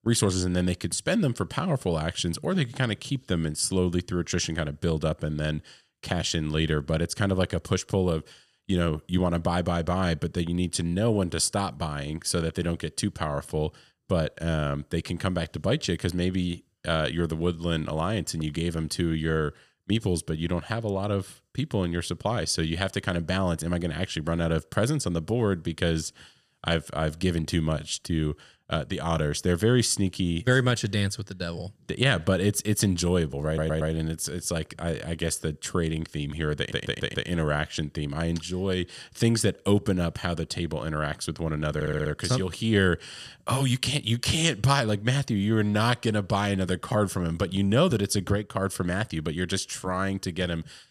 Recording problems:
audio stuttering; at 33 s, at 37 s and at 42 s

